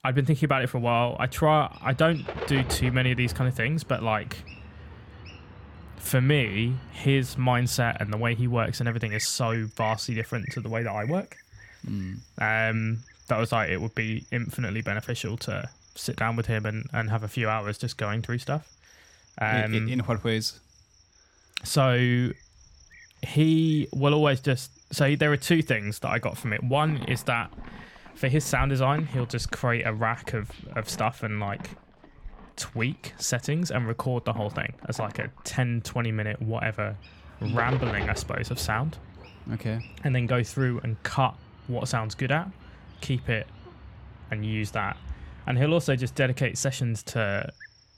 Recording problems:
animal sounds; noticeable; throughout; 15 dB below the speech

